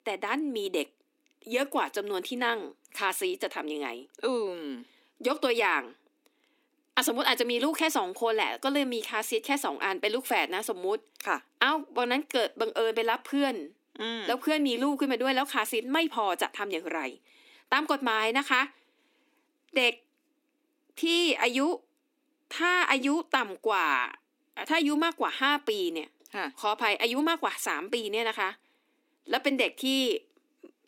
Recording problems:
thin; very slightly; fading below 250 Hz

